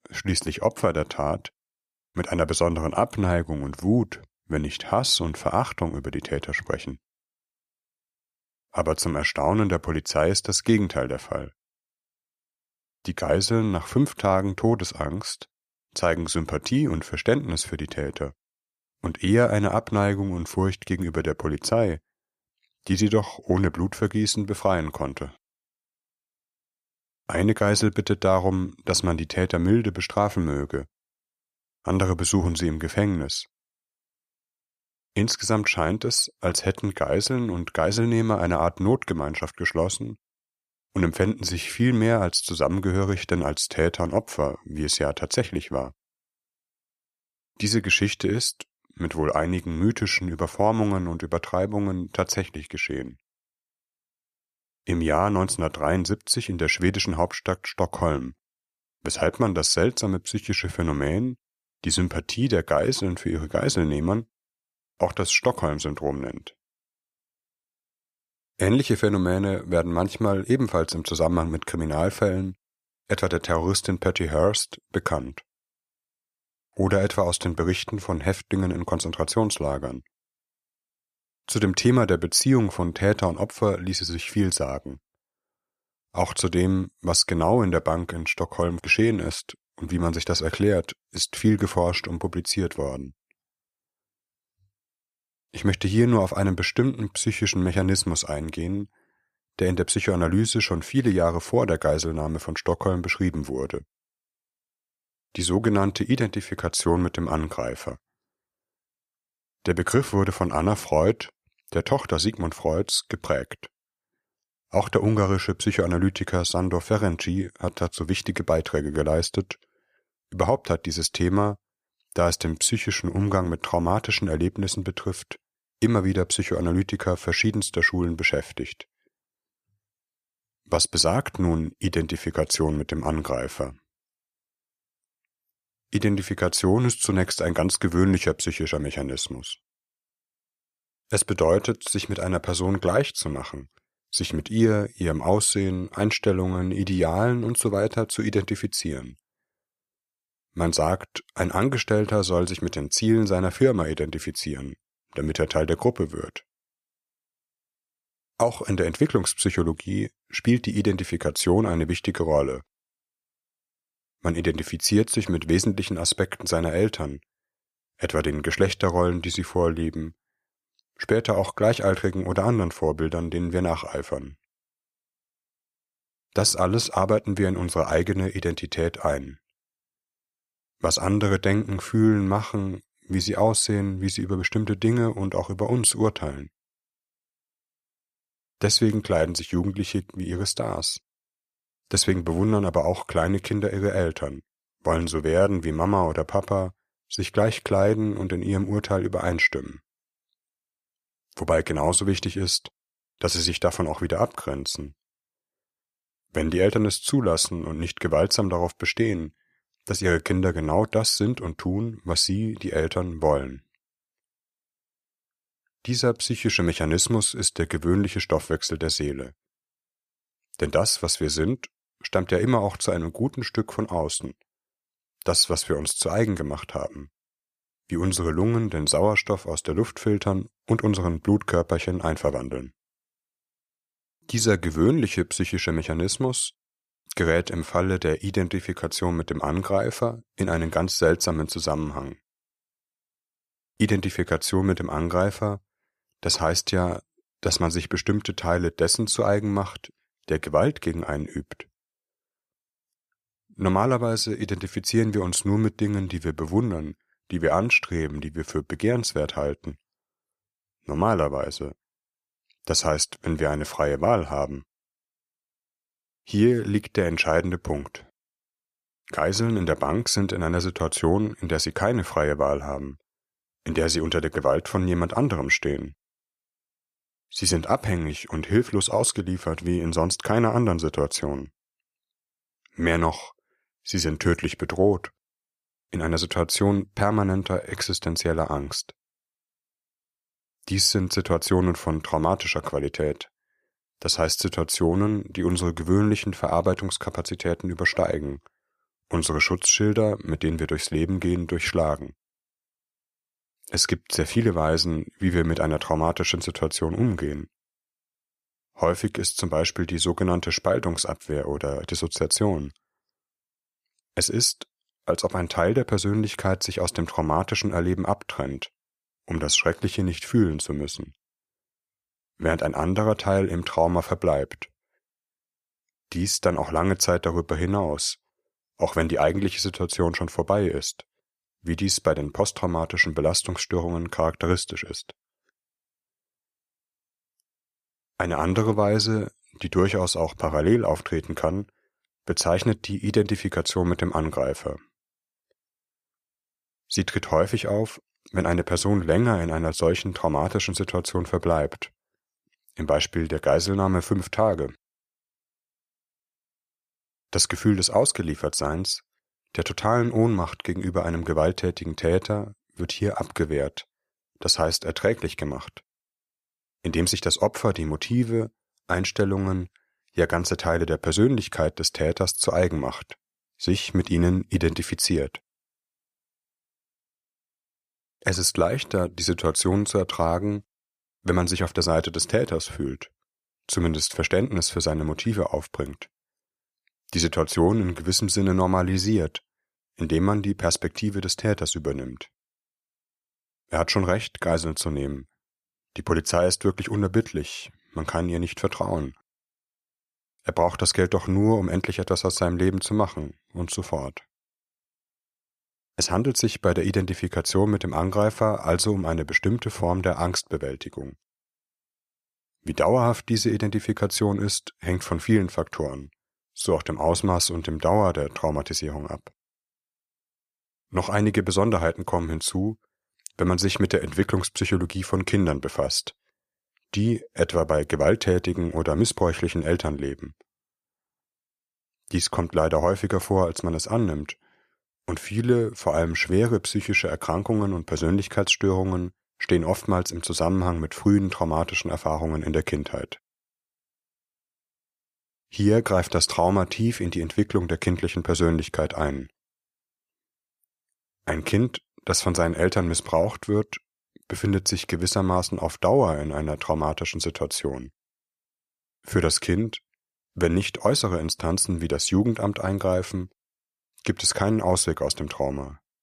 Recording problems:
none

